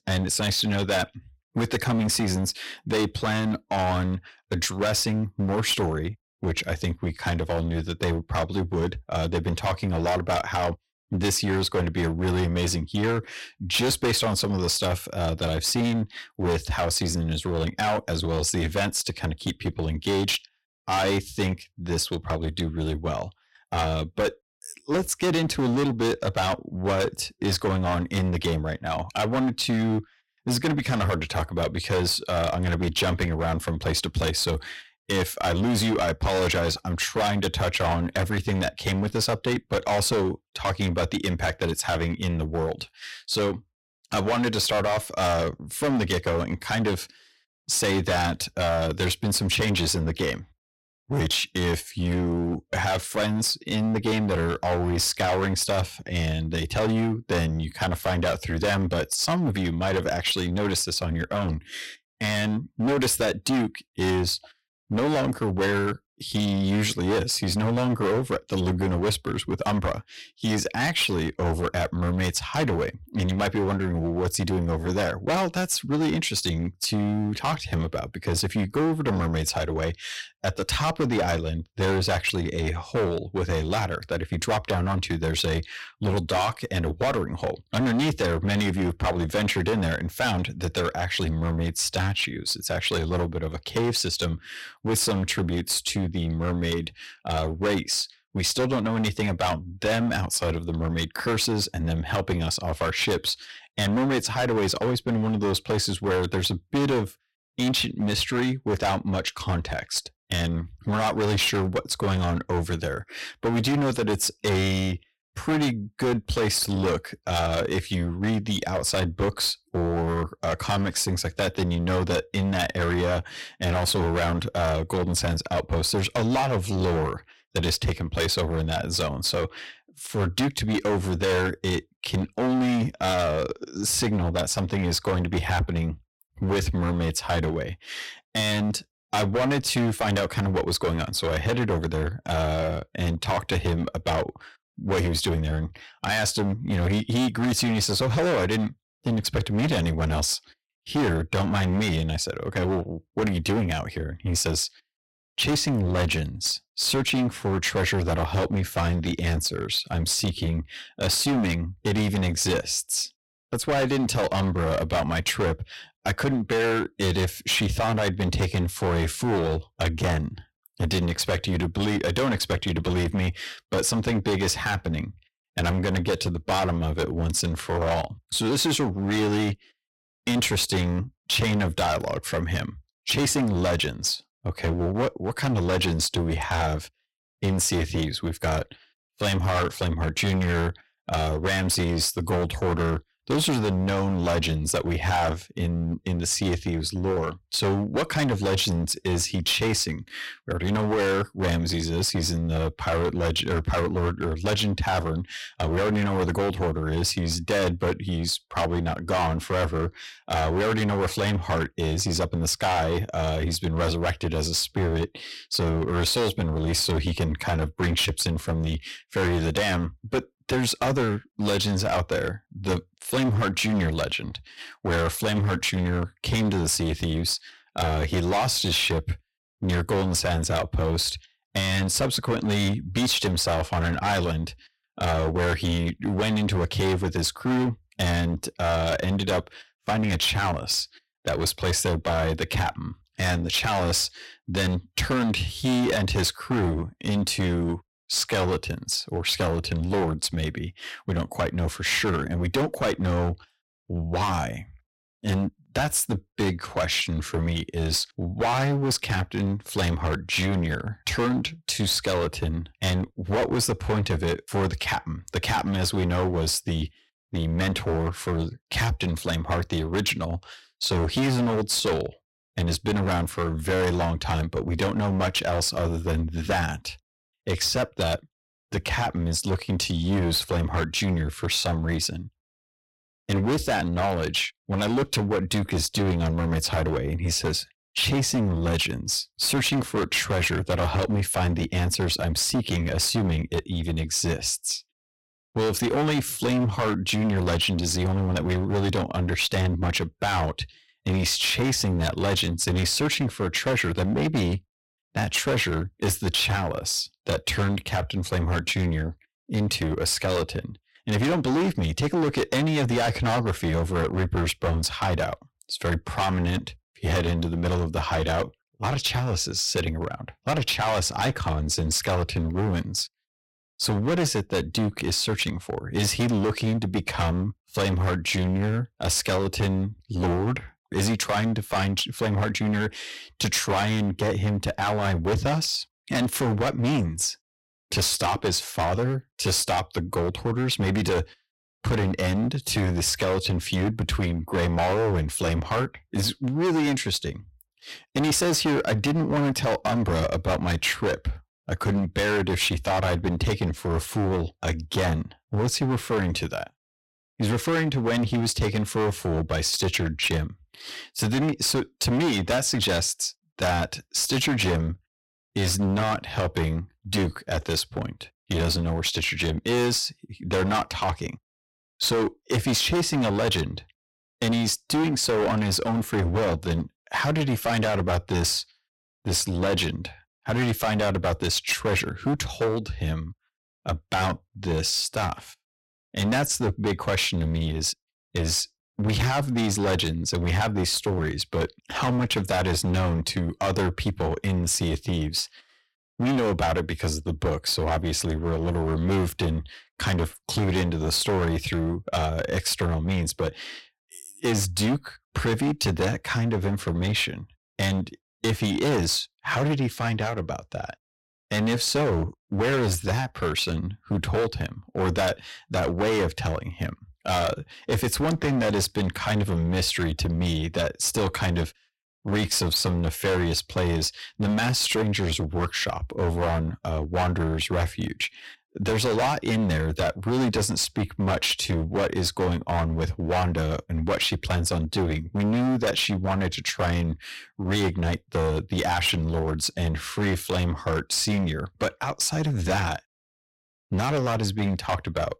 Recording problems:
distortion; heavy; 18% of the sound clipped

